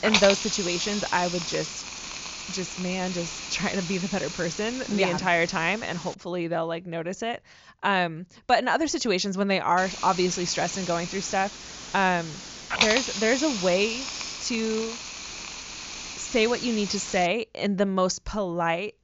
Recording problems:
high frequencies cut off; noticeable; nothing above 7 kHz
hiss; loud; until 6 s and from 10 to 17 s; 6 dB below the speech

